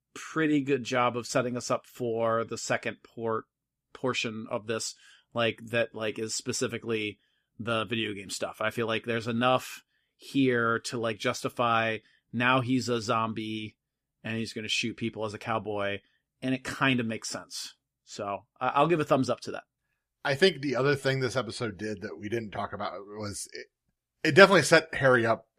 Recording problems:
none

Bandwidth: 14.5 kHz